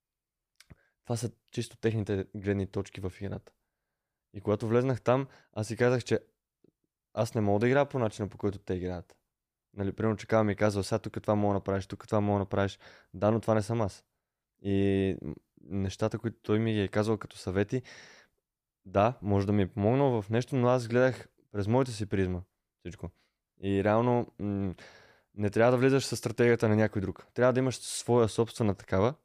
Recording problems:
none

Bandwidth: 15 kHz